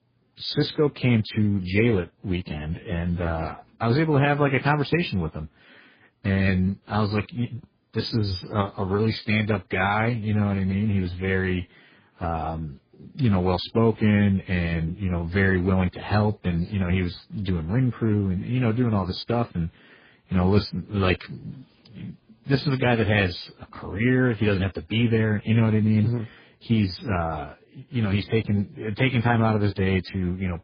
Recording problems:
garbled, watery; badly; nothing above 5 kHz

